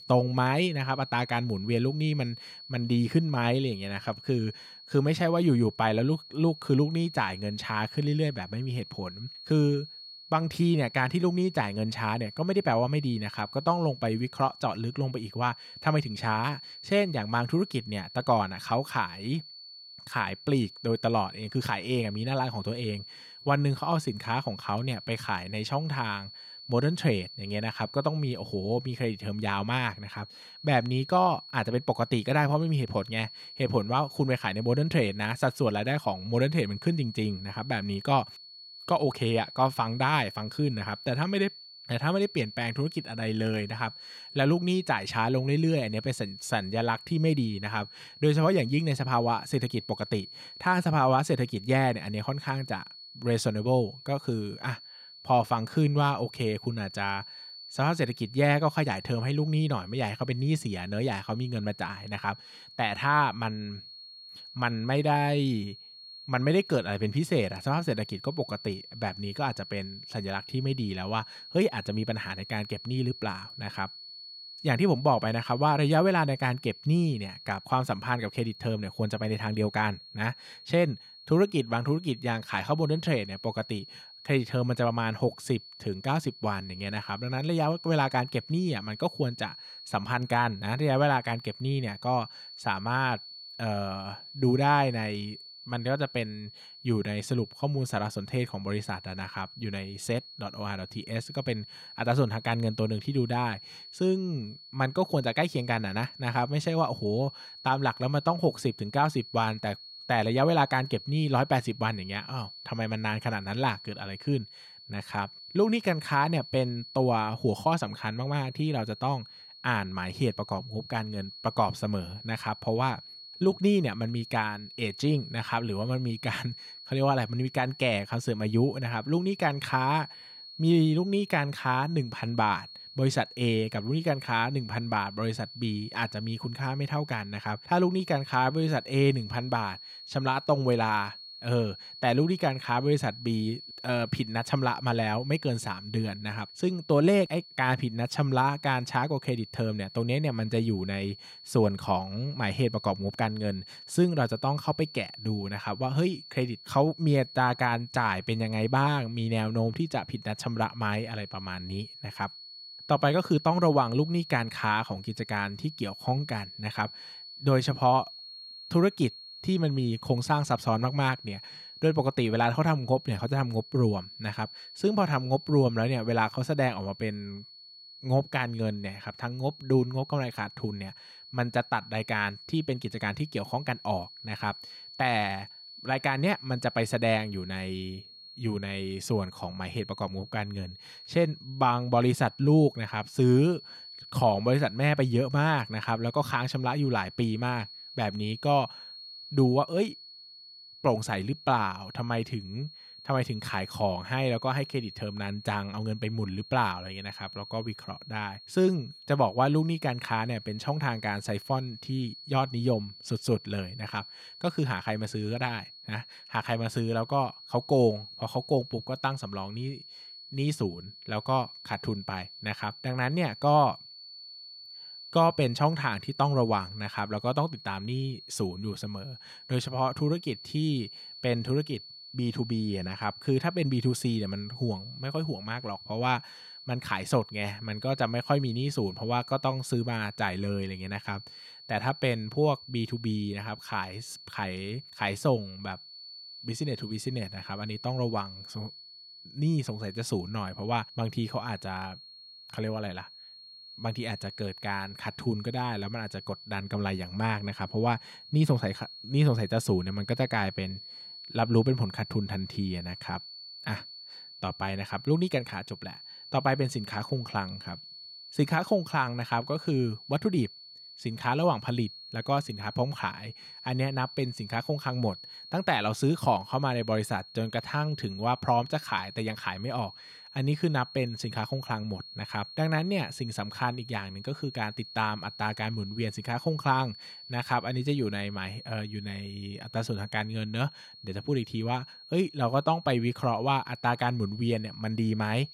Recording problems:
high-pitched whine; noticeable; throughout; 4.5 kHz, 15 dB below the speech

